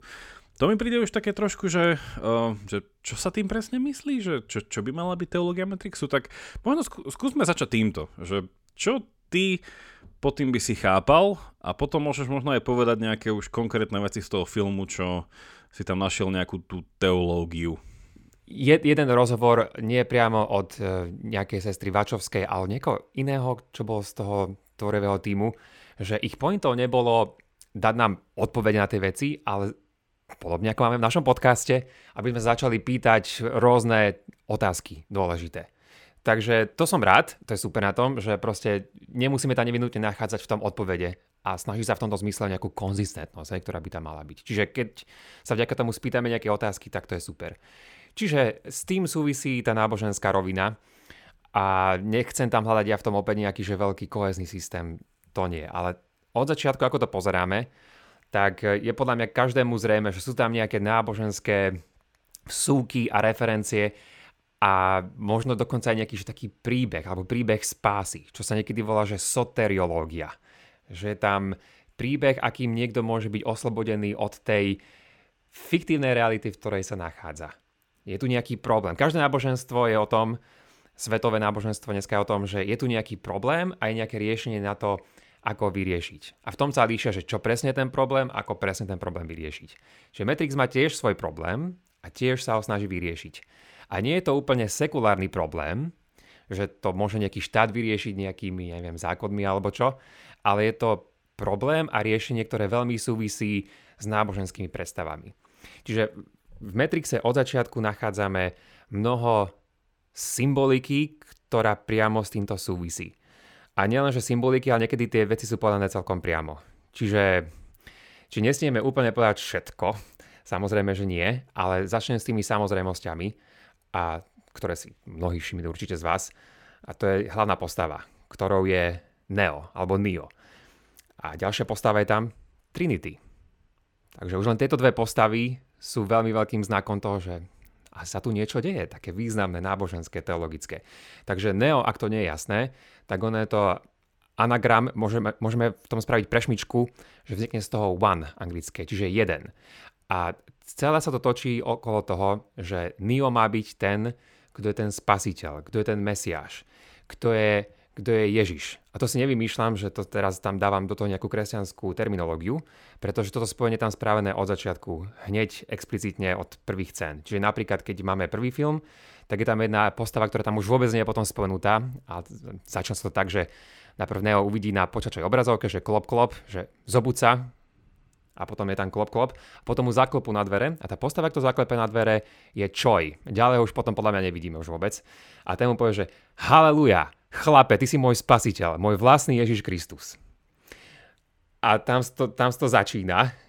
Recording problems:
none

